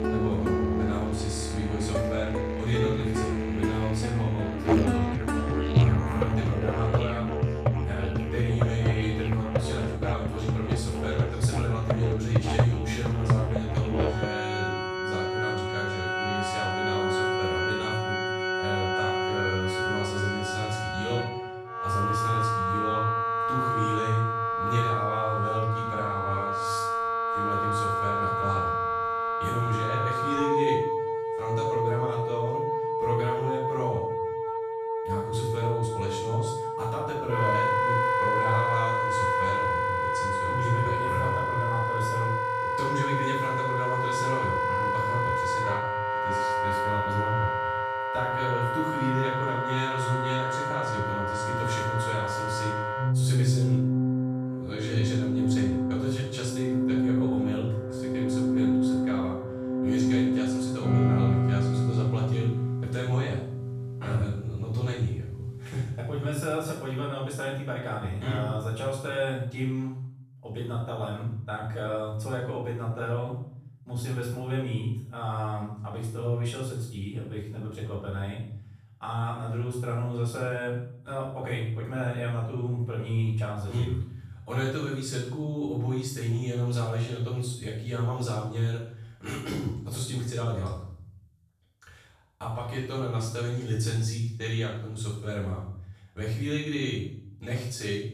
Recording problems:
off-mic speech; far
room echo; noticeable; dies away in 0.7 s
background music; very loud; until 1:07; 4 dB above the speech

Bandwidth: 14.5 kHz